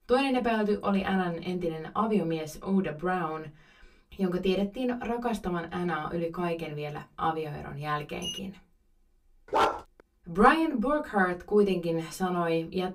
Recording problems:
off-mic speech; far
room echo; very slight; dies away in 0.2 s
clattering dishes; noticeable; at 8 s; peak 8 dB below the speech
dog barking; loud; at 9.5 s; peak 2 dB above the speech

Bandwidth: 15.5 kHz